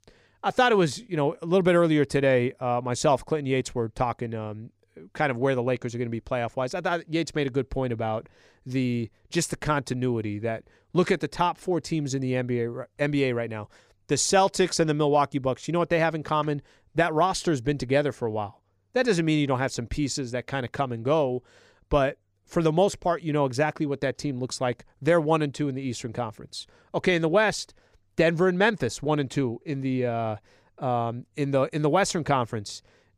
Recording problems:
none

